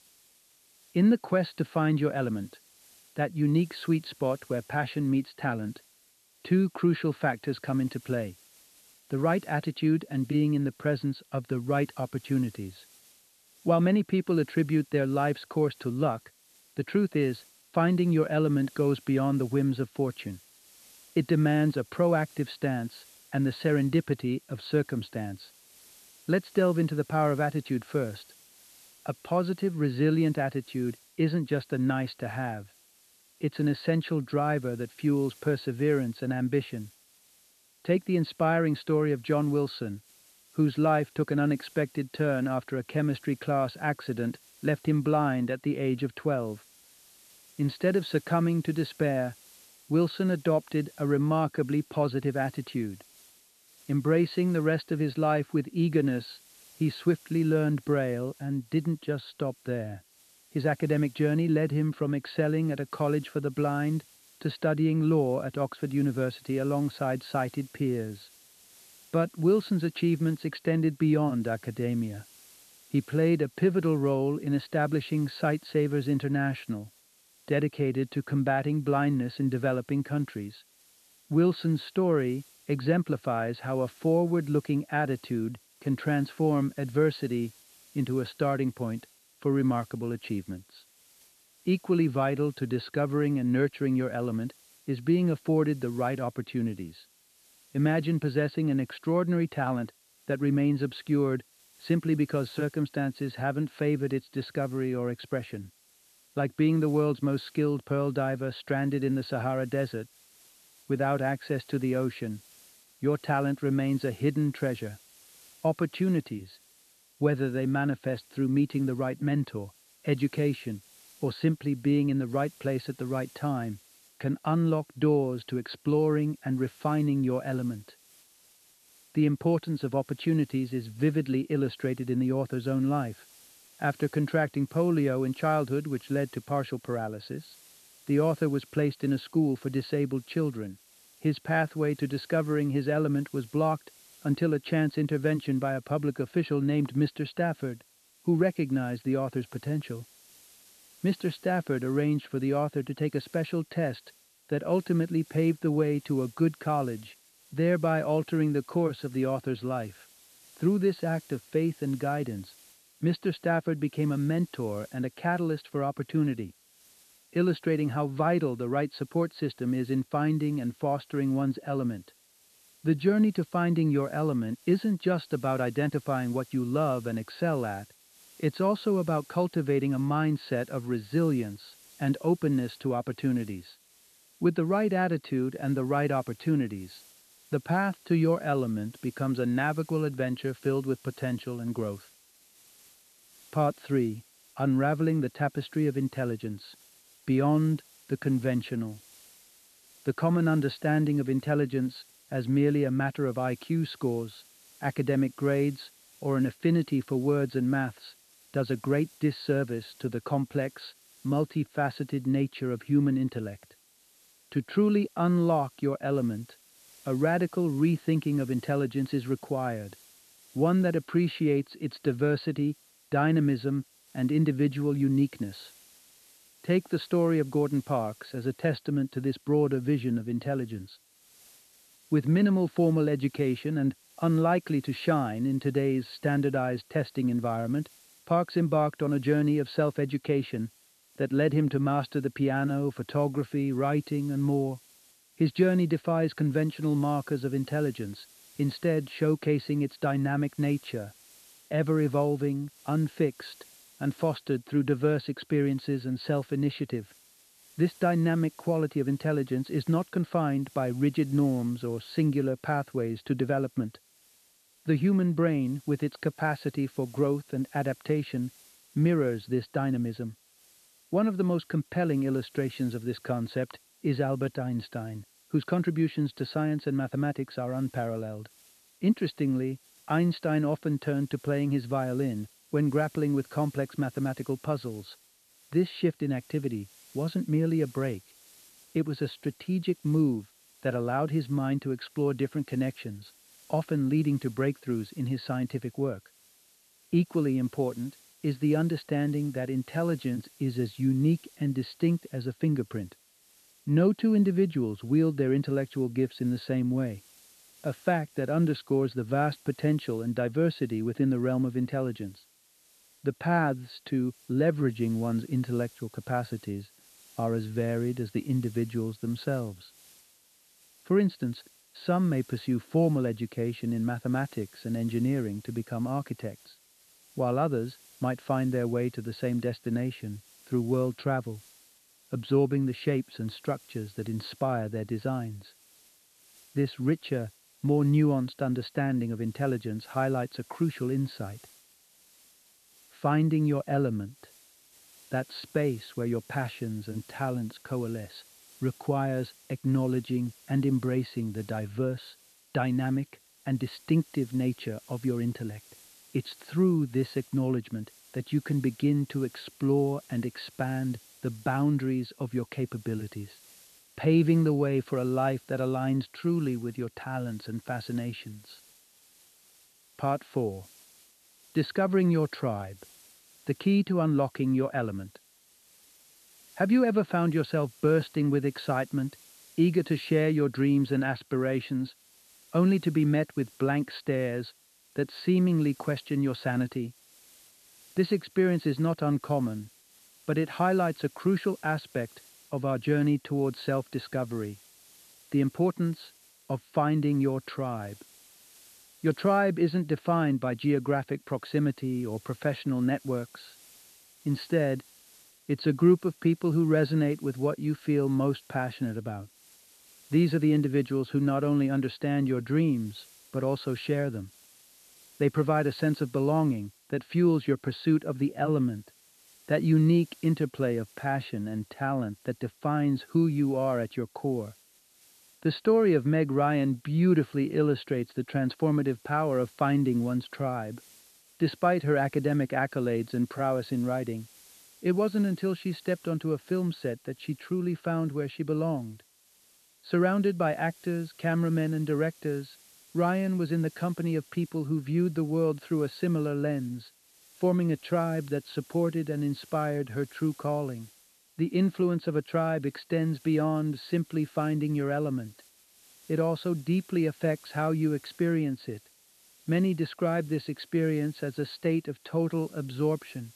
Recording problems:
high frequencies cut off; severe; nothing above 4.5 kHz
hiss; faint; throughout; 25 dB below the speech

